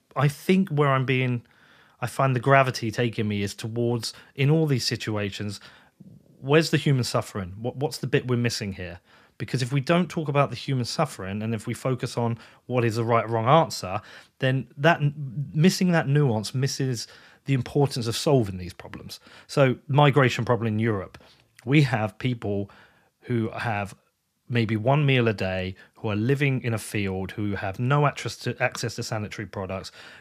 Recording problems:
none

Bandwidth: 14.5 kHz